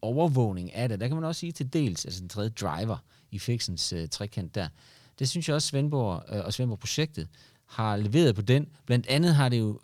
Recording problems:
none

